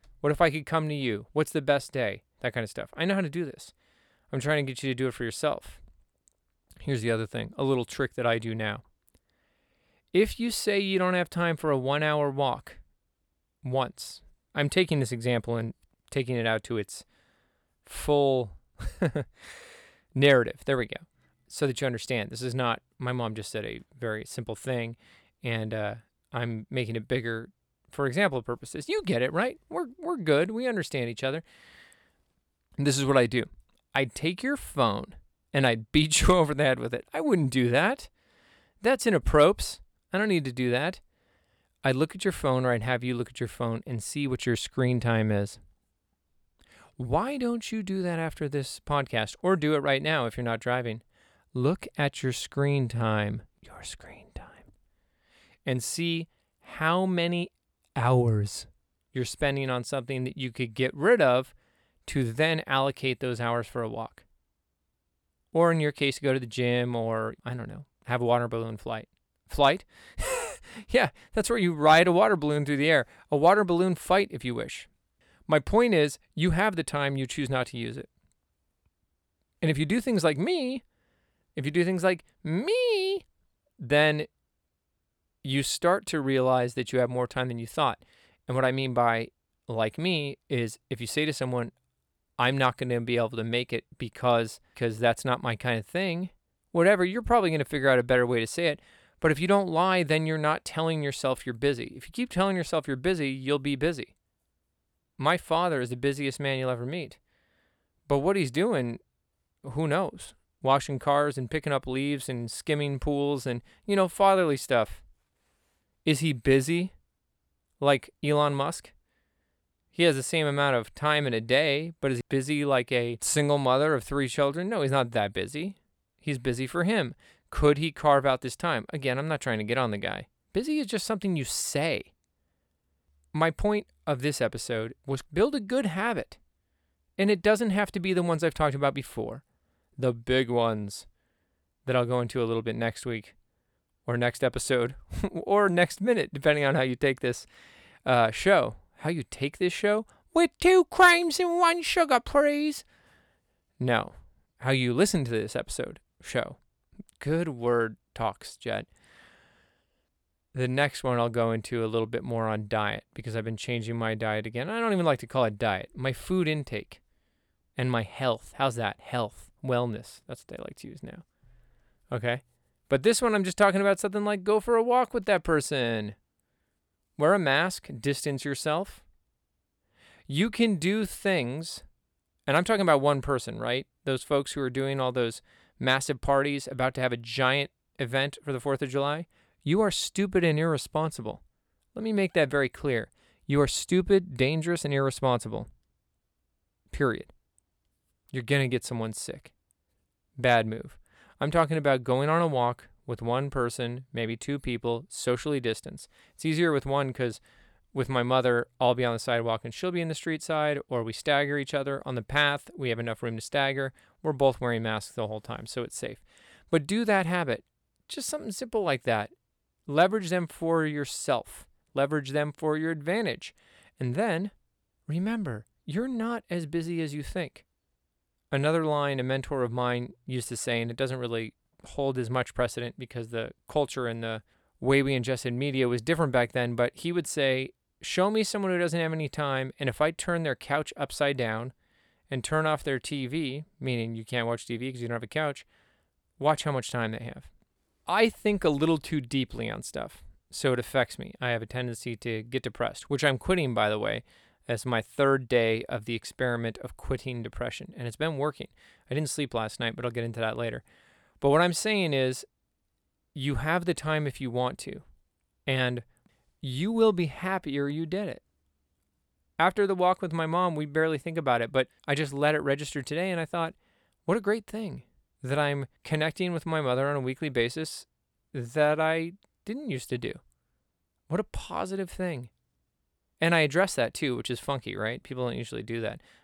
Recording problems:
none

